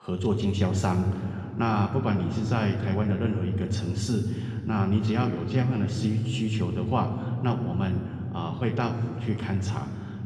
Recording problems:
room echo; noticeable; dies away in 3 s
off-mic speech; somewhat distant

